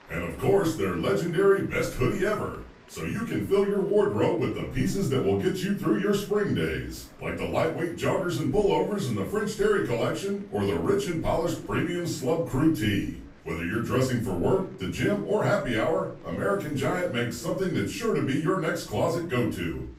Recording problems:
off-mic speech; far
room echo; noticeable; dies away in 0.4 s
chatter from many people; faint; throughout; 25 dB below the speech

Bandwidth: 15.5 kHz